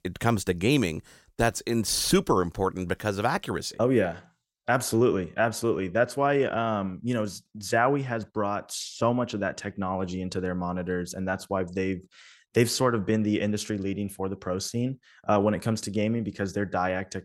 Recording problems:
none

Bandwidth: 16 kHz